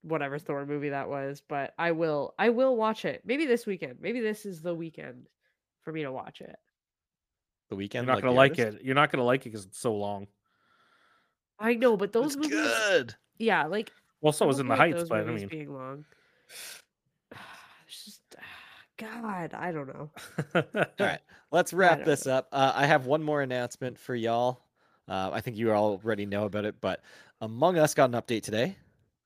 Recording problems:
none

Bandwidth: 15 kHz